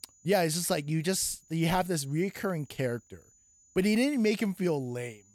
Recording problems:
high-pitched whine; faint; throughout; 7 kHz, 30 dB below the speech

